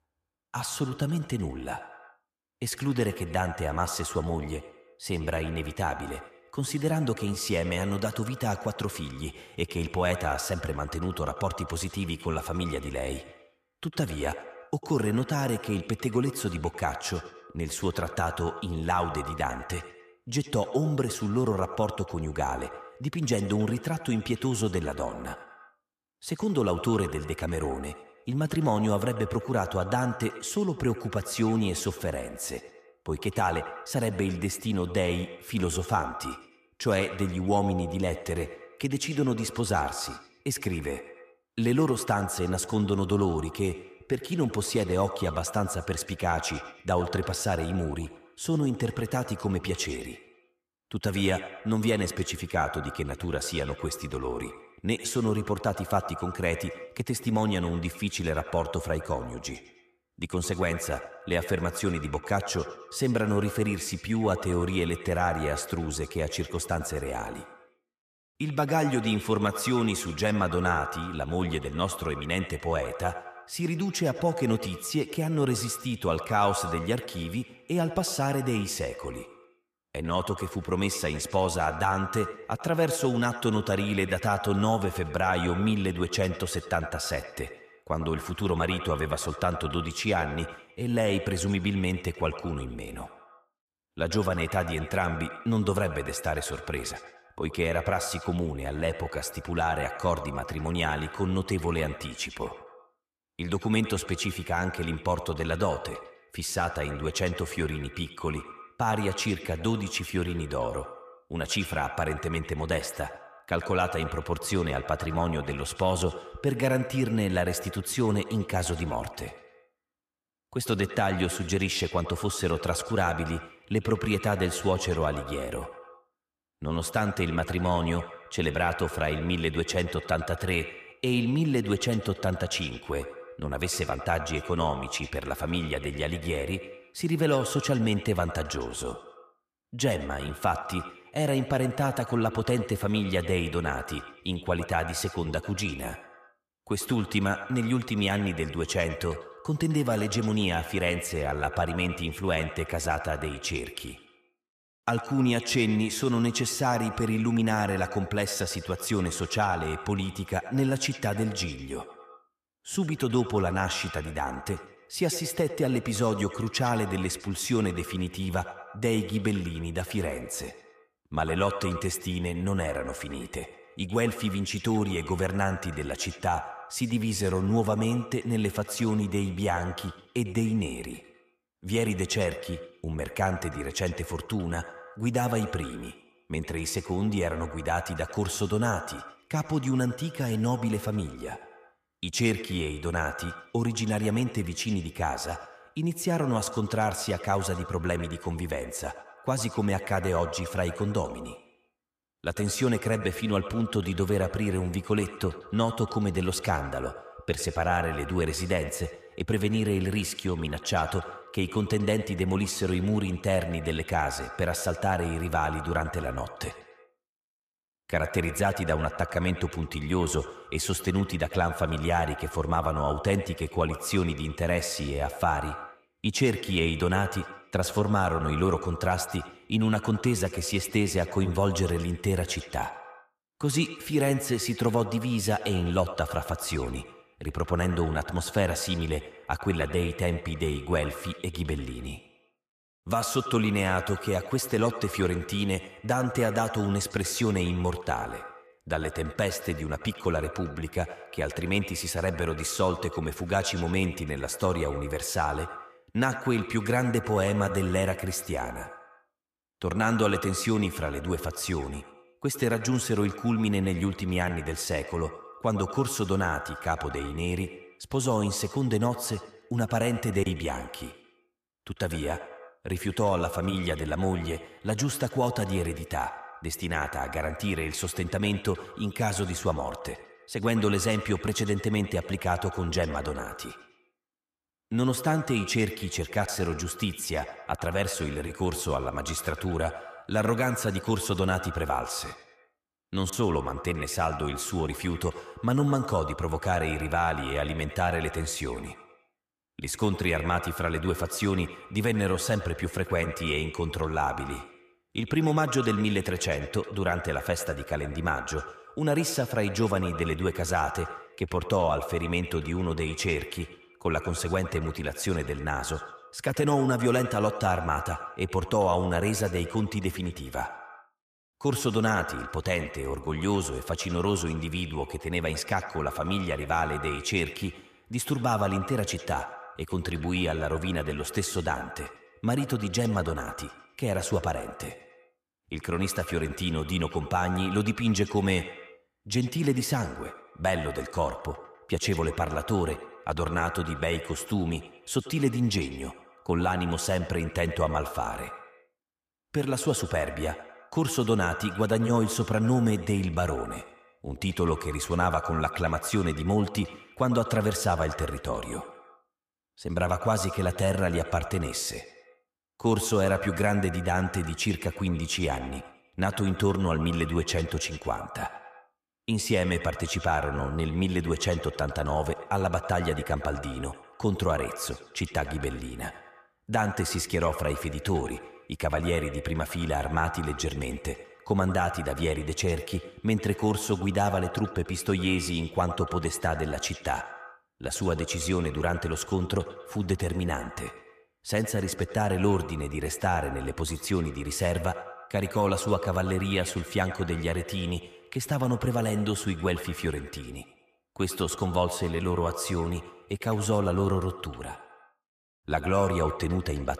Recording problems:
echo of what is said; strong; throughout; 100 ms later, 10 dB below the speech

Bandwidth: 14.5 kHz